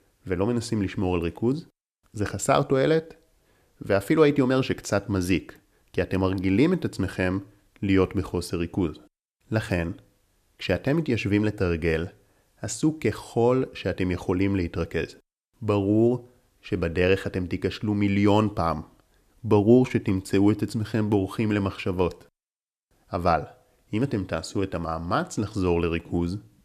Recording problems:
none

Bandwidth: 14.5 kHz